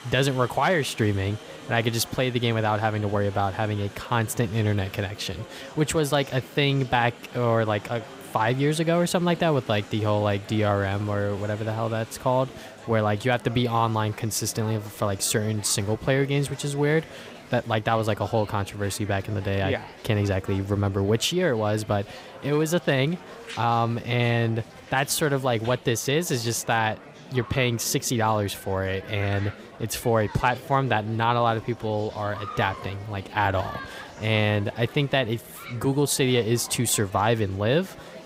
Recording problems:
murmuring crowd; noticeable; throughout; 15 dB below the speech

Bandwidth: 15.5 kHz